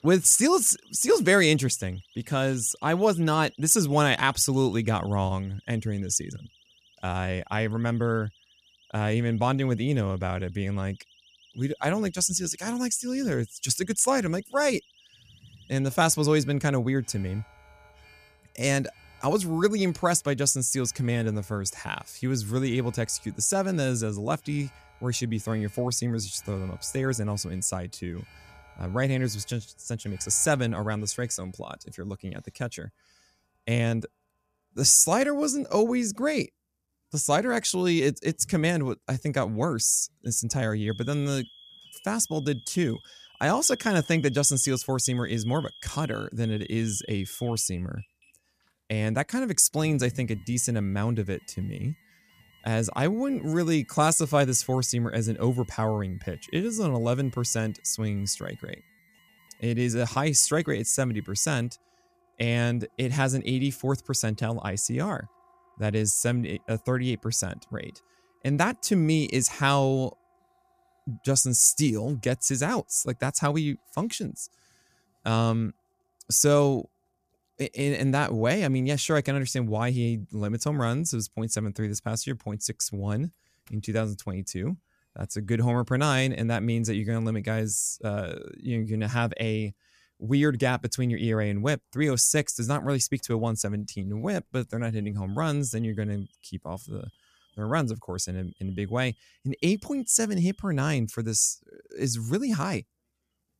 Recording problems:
alarms or sirens; faint; throughout; 25 dB below the speech

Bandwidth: 14.5 kHz